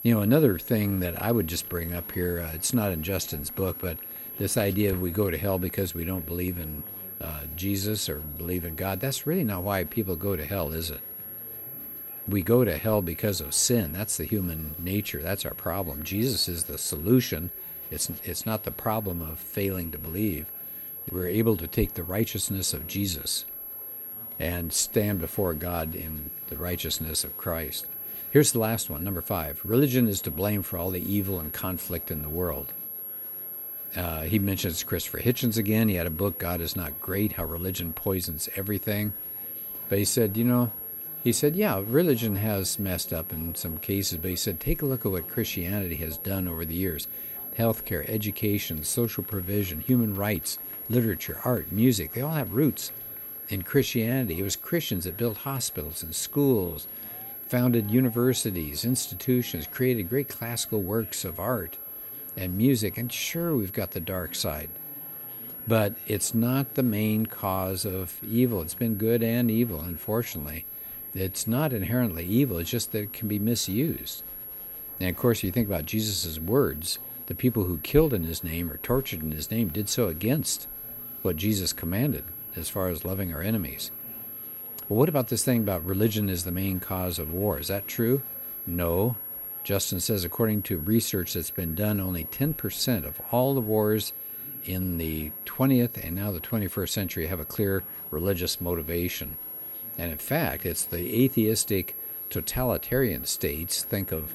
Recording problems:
high-pitched whine; loud; throughout; 11.5 kHz, 7 dB below the speech
murmuring crowd; faint; throughout; 25 dB below the speech

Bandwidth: 16 kHz